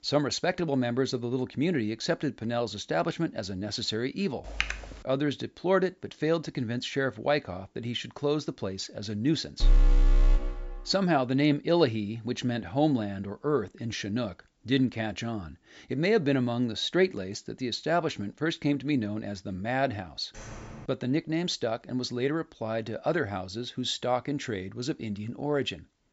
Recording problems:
high frequencies cut off; noticeable; nothing above 8 kHz
keyboard typing; noticeable; at 4.5 s; peak 2 dB below the speech
alarm; loud; from 9.5 to 11 s; peak 5 dB above the speech
door banging; faint; at 20 s; peak 15 dB below the speech

